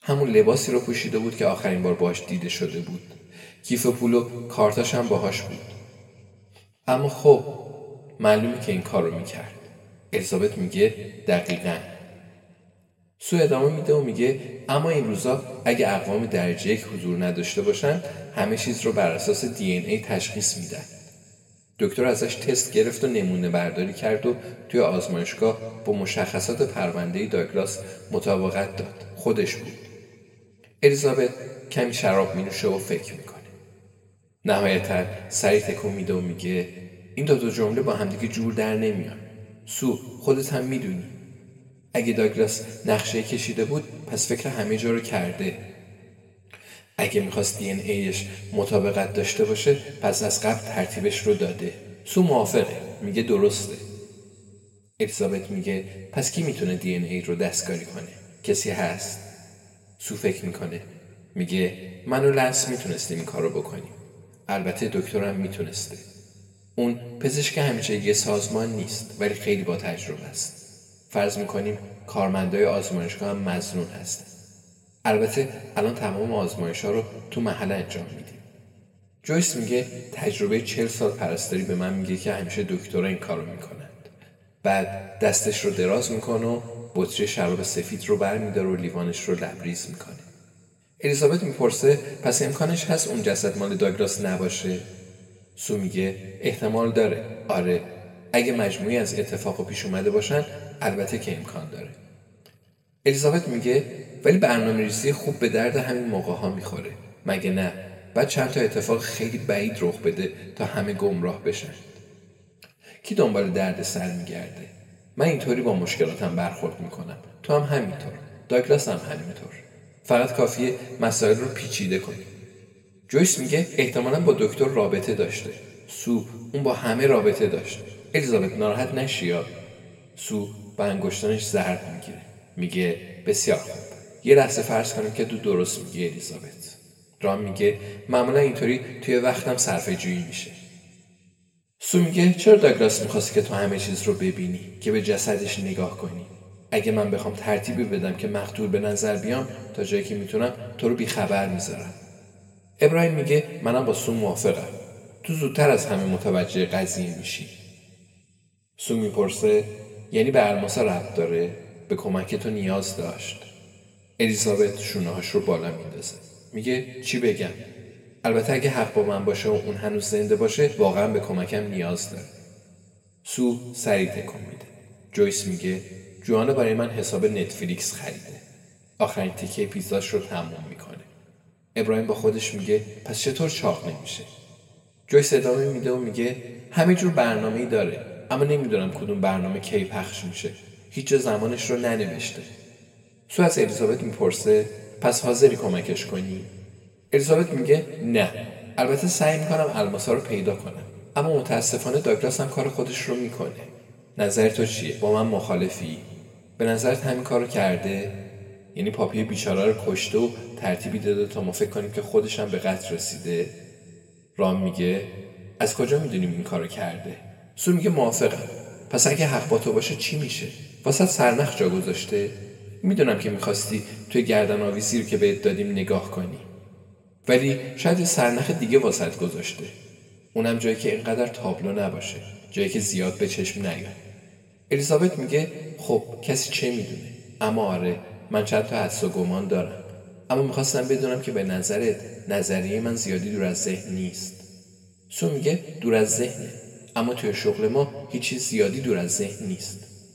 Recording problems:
room echo; slight; dies away in 1.8 s
off-mic speech; somewhat distant

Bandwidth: 16 kHz